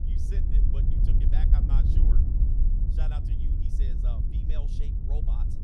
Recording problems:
wind noise on the microphone; heavy; 3 dB above the speech

